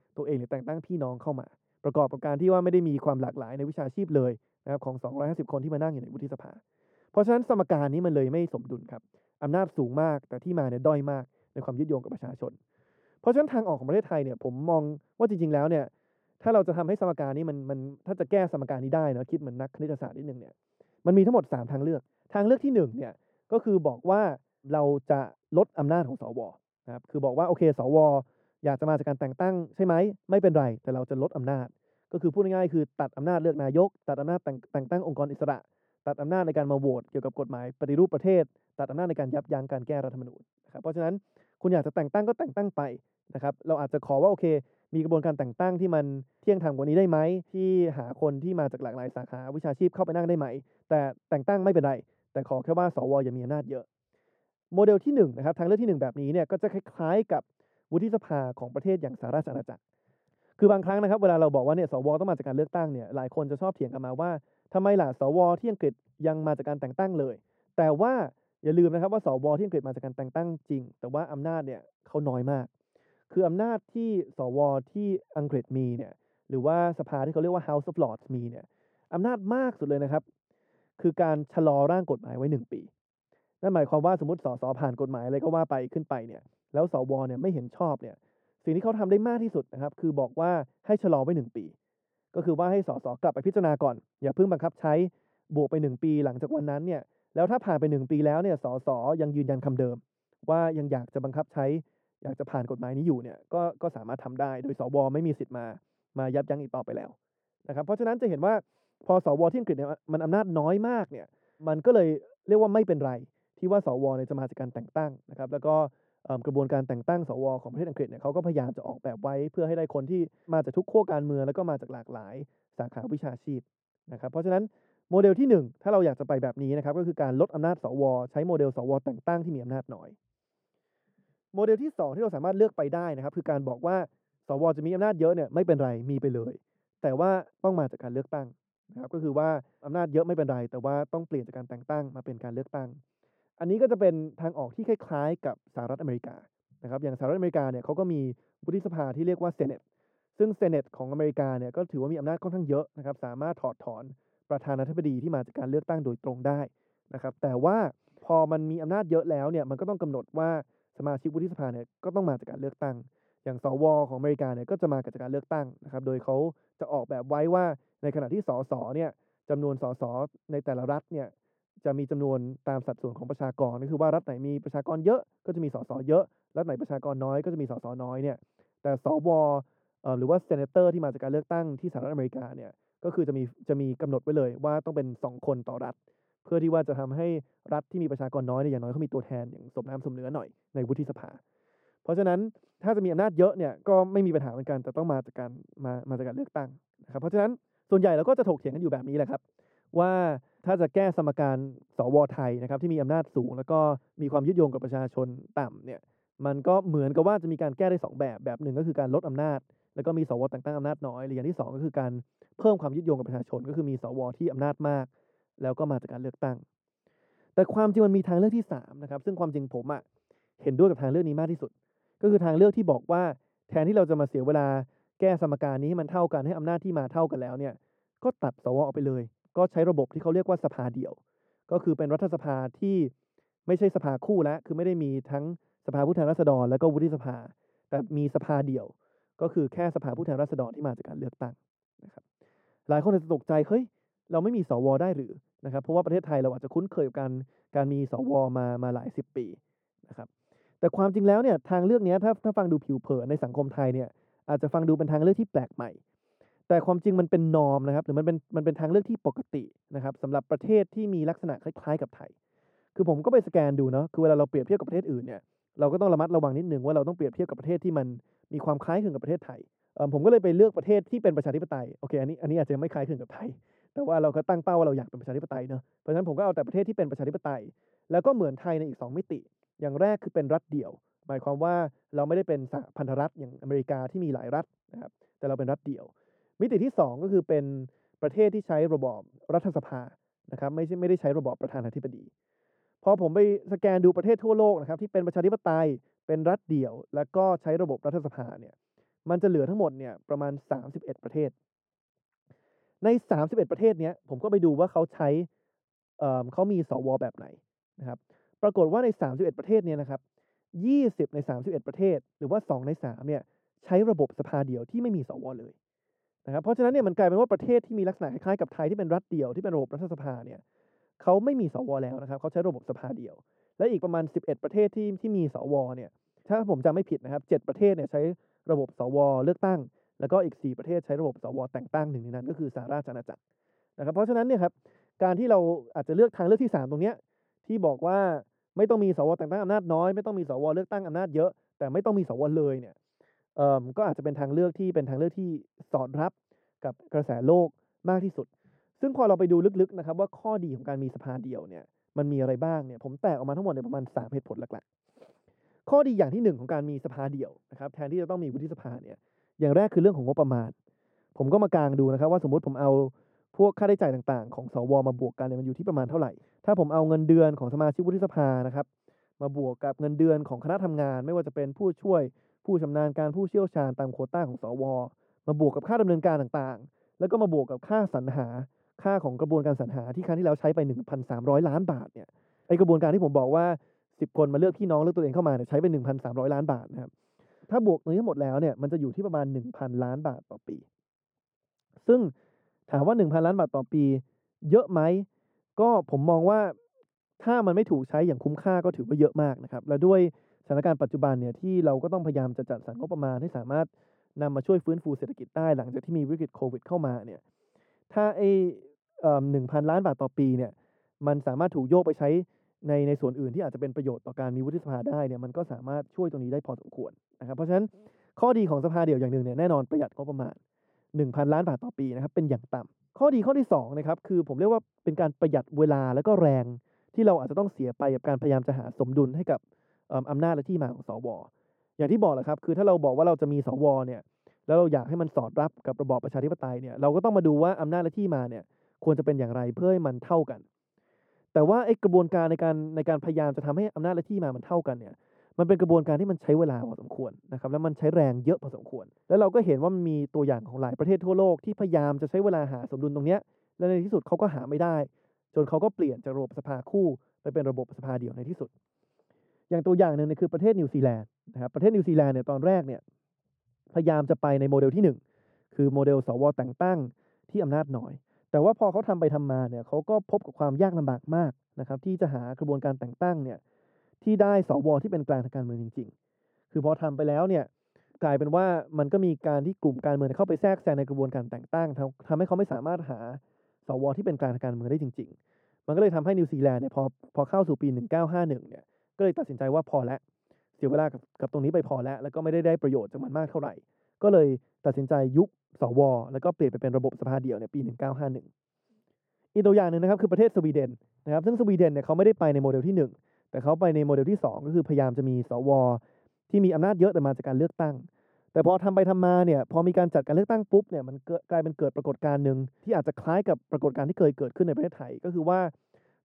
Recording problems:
muffled; very; fading above 1.5 kHz

